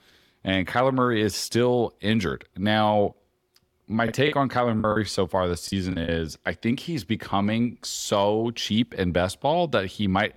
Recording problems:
choppy; very; from 4 to 6 s; 10% of the speech affected

